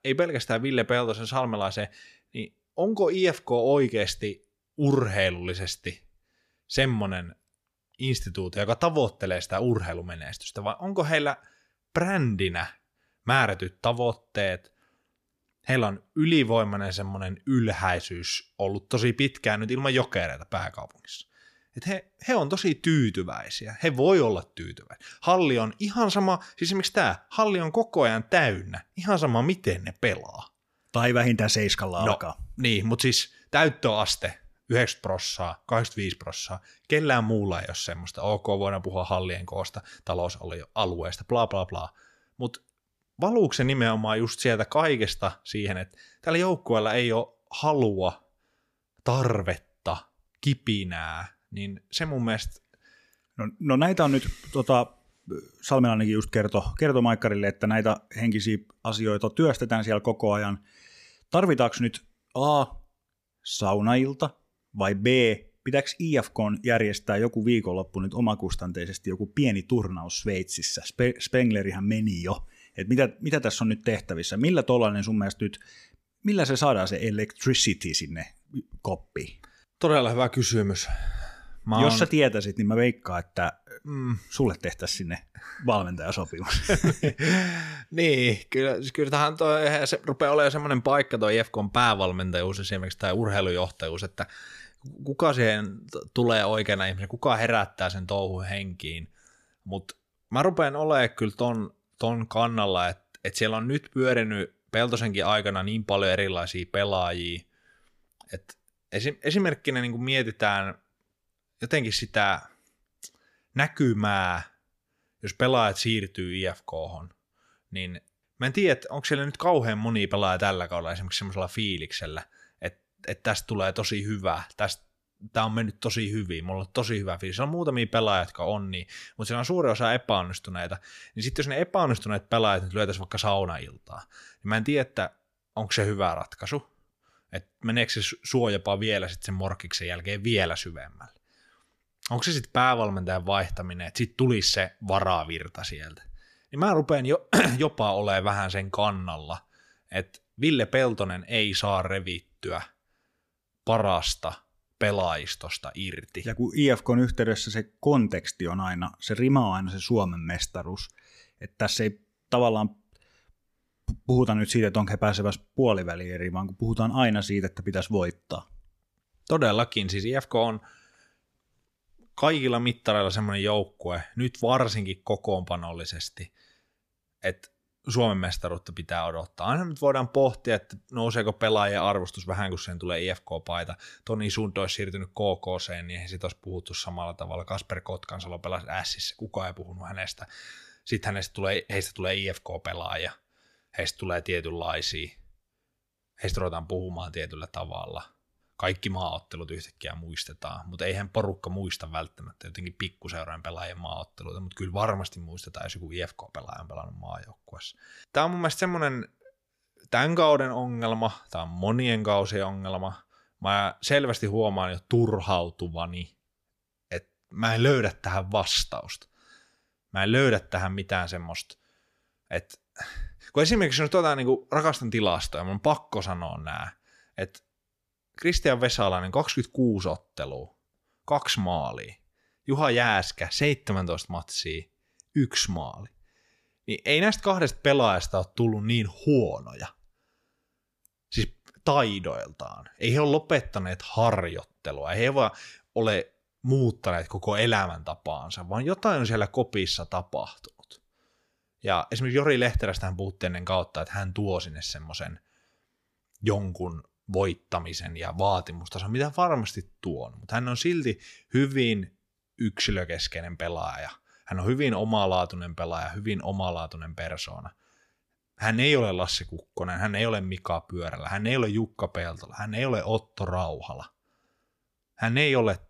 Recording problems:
none

